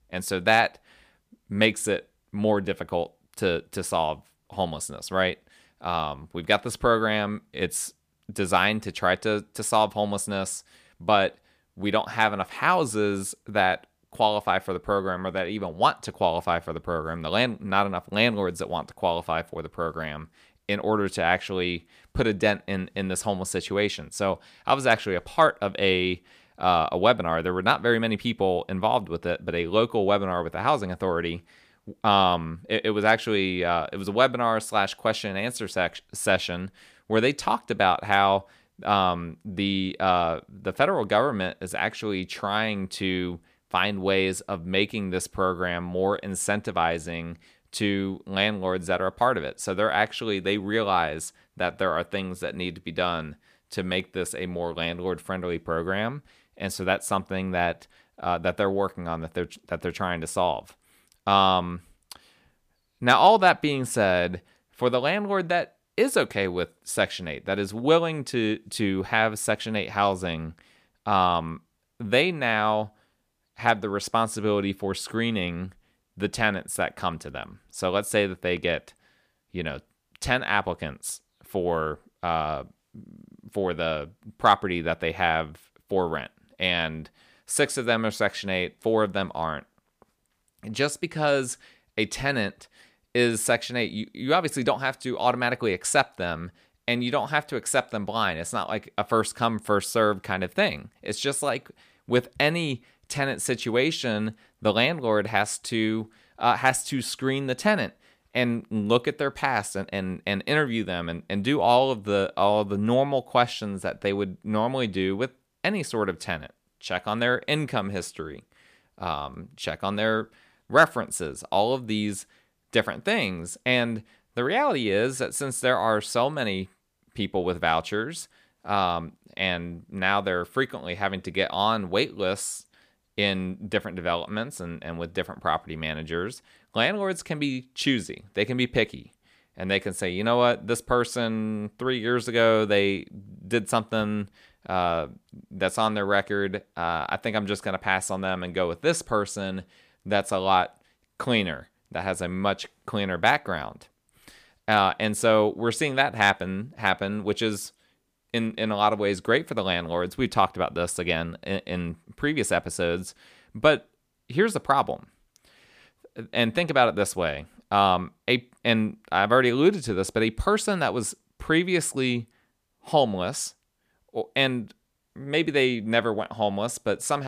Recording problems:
abrupt cut into speech; at the end

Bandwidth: 15 kHz